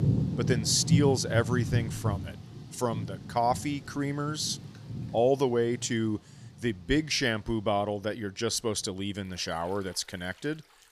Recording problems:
rain or running water; loud; throughout; 3 dB below the speech

